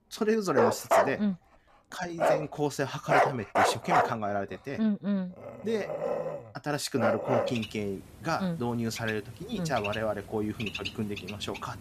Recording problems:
animal sounds; very loud; throughout; 3 dB above the speech

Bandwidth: 14.5 kHz